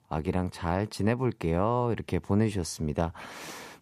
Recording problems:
none

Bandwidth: 14.5 kHz